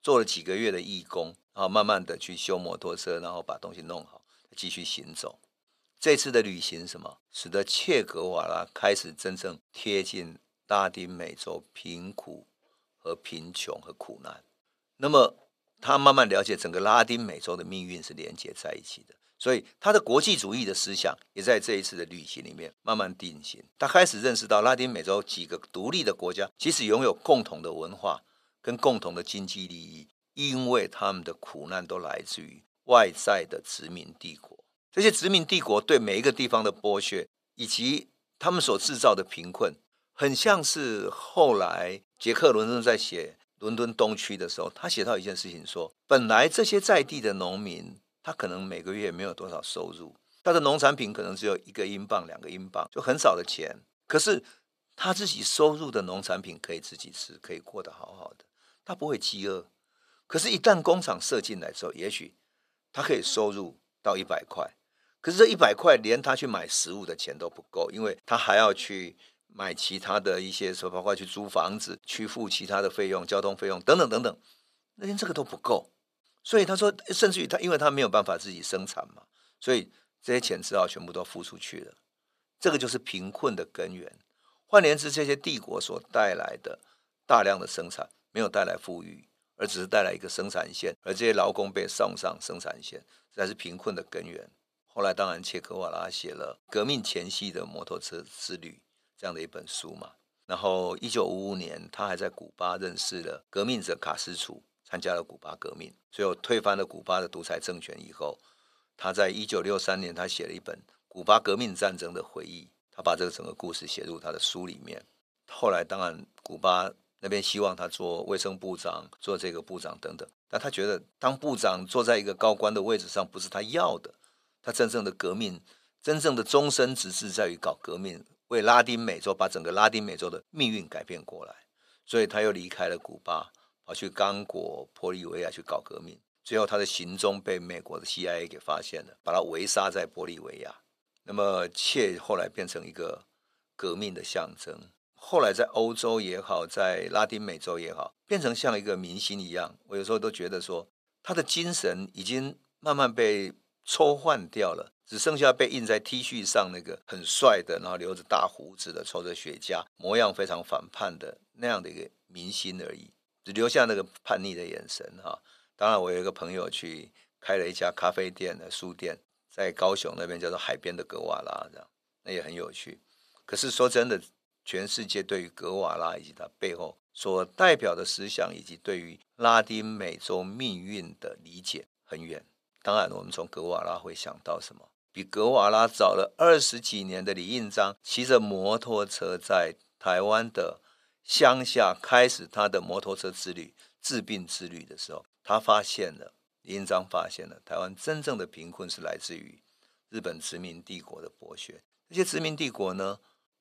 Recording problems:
thin; somewhat; fading below 400 Hz

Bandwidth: 14.5 kHz